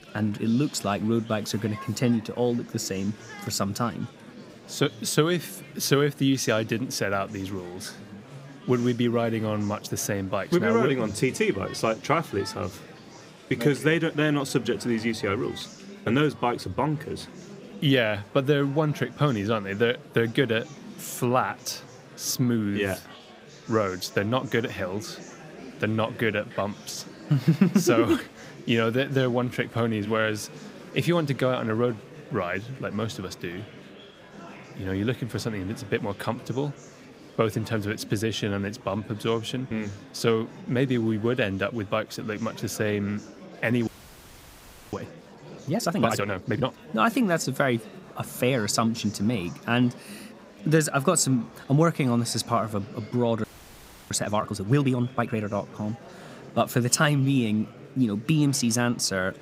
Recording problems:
murmuring crowd; noticeable; throughout; 20 dB below the speech
audio freezing; at 44 s for 1 s and at 53 s for 0.5 s

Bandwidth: 15.5 kHz